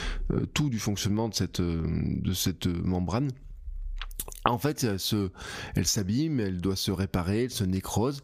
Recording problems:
squashed, flat; heavily

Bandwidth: 15 kHz